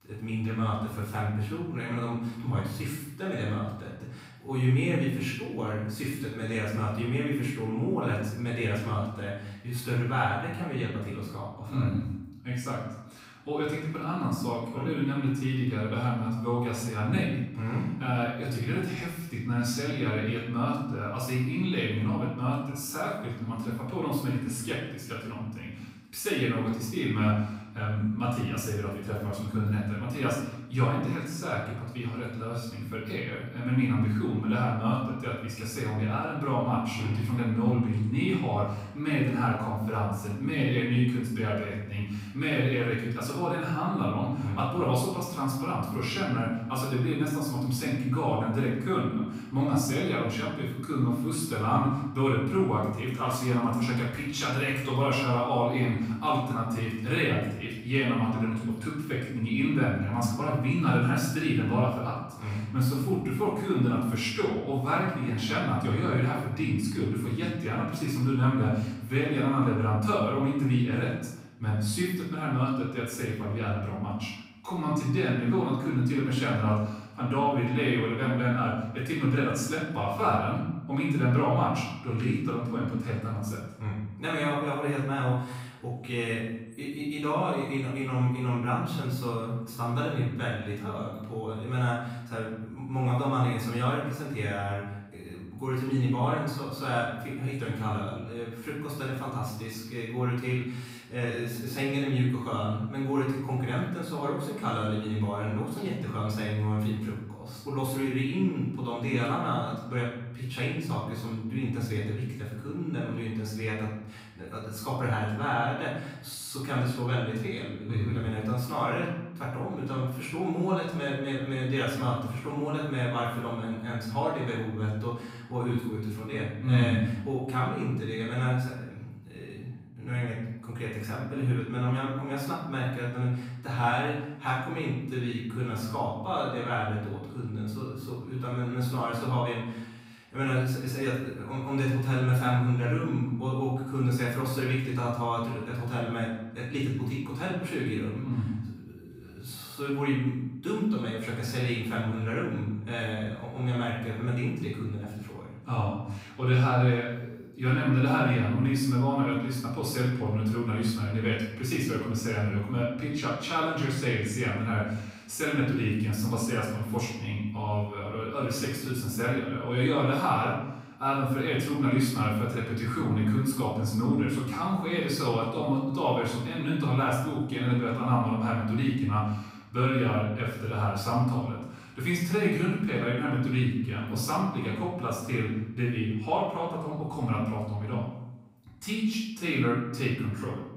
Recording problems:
off-mic speech; far
room echo; noticeable; dies away in 0.8 s

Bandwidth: 15.5 kHz